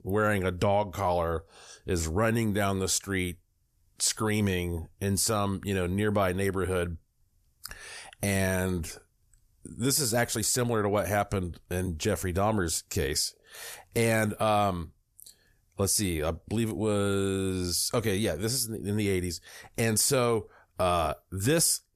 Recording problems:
none

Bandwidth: 14.5 kHz